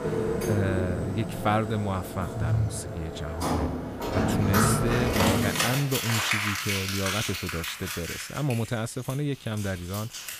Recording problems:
household noises; very loud; throughout; 2 dB above the speech

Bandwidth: 15 kHz